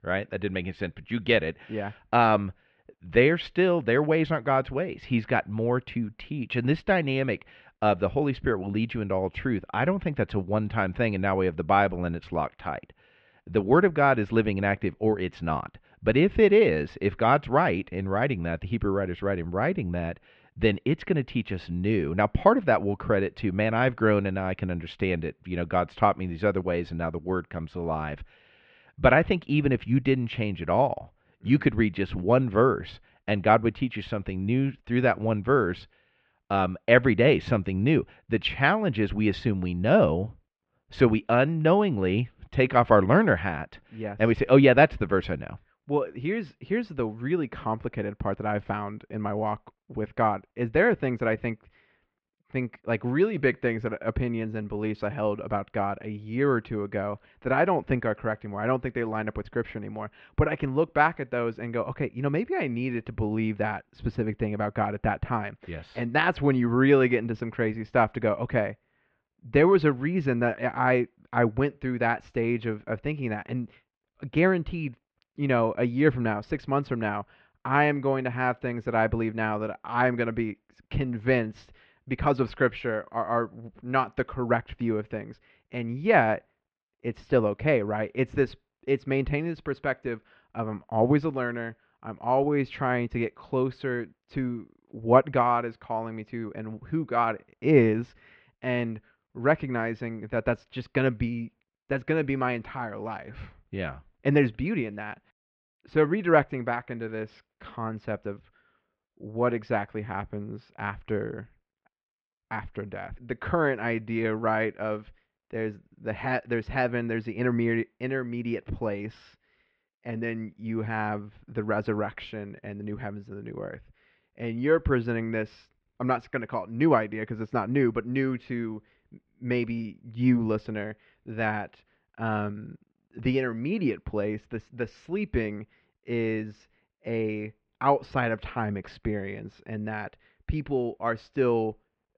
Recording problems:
muffled; very; fading above 3 kHz

